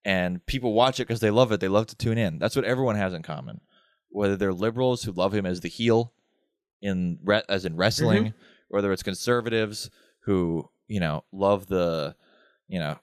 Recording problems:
none

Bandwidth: 14.5 kHz